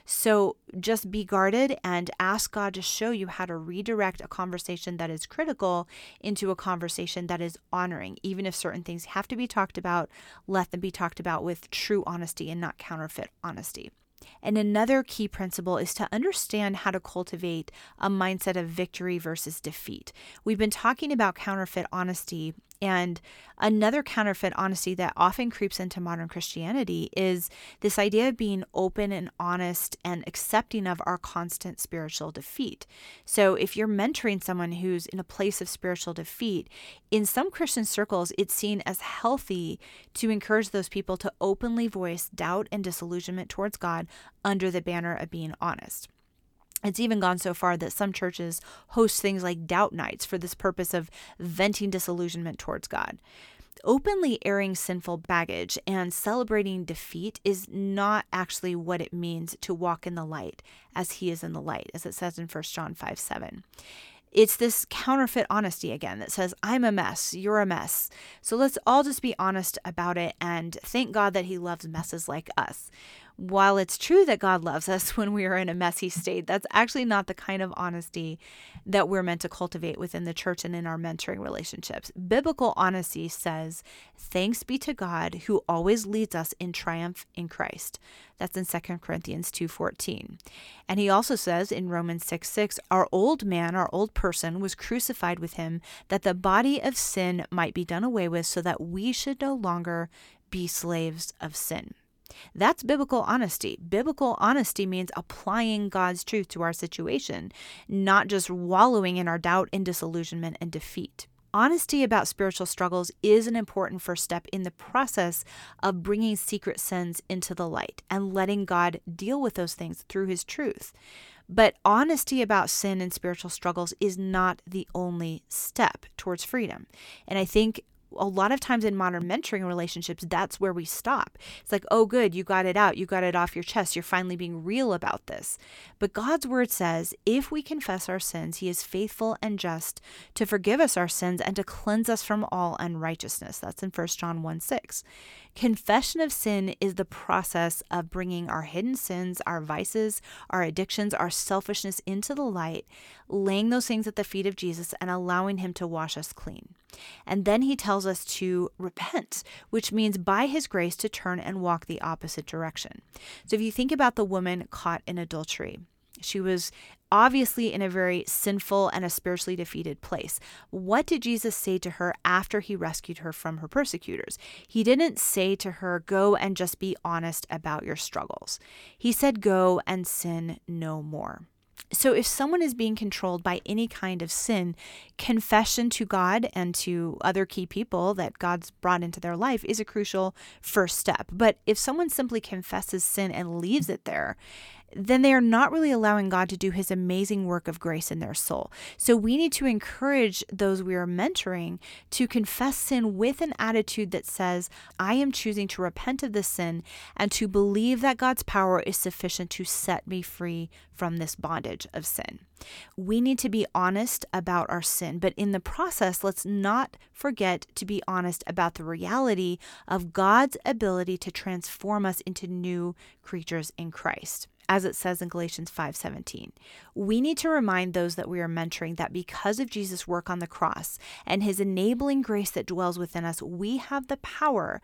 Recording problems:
none

